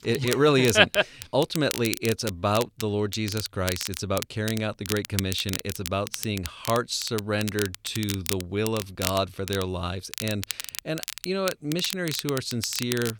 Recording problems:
crackle, like an old record; loud; 8 dB below the speech

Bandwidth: 18.5 kHz